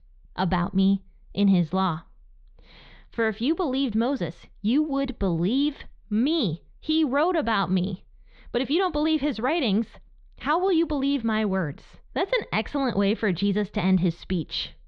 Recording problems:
muffled; very slightly; fading above 4 kHz

